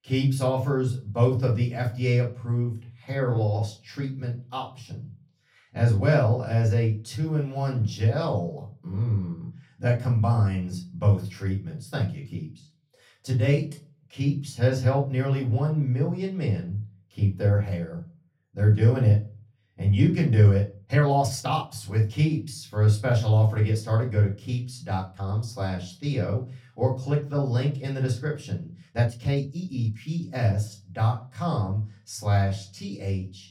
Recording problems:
off-mic speech; far
room echo; slight; dies away in 0.3 s
uneven, jittery; strongly; from 3.5 to 30 s

